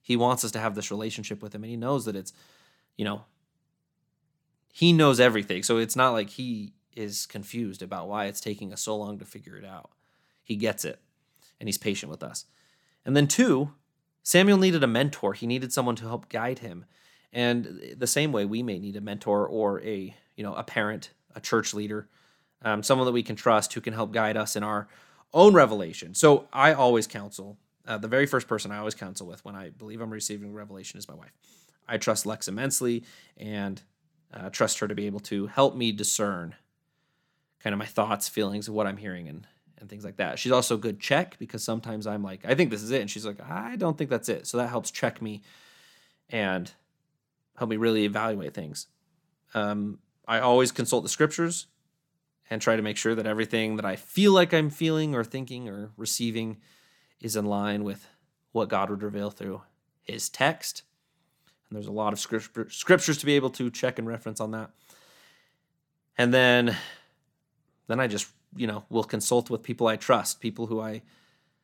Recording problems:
none

